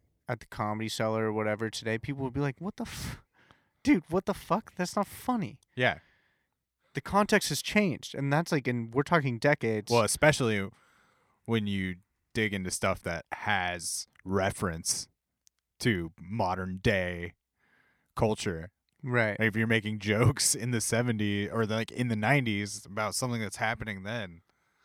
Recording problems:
none

